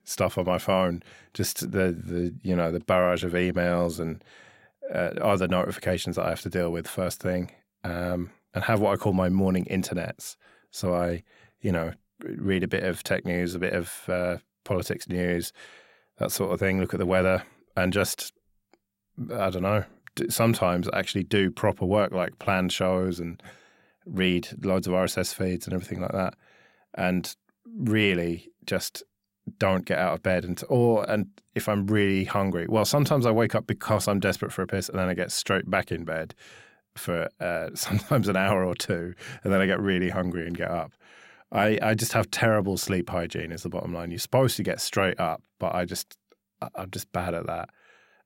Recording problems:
none

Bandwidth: 16 kHz